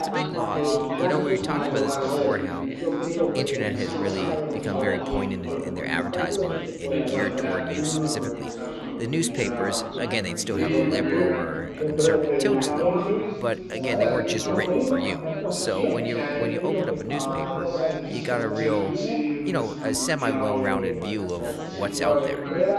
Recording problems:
chatter from many people; very loud; throughout; 3 dB above the speech

